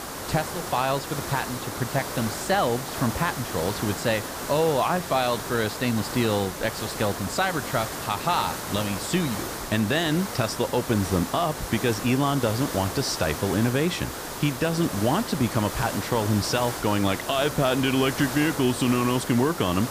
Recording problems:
hiss; loud; throughout; 7 dB below the speech

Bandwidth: 15 kHz